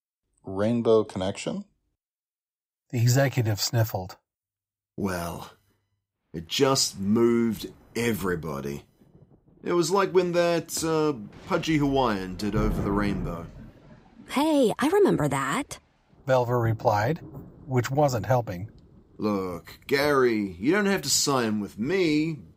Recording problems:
rain or running water; noticeable; from 6.5 s on; 15 dB below the speech

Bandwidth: 15.5 kHz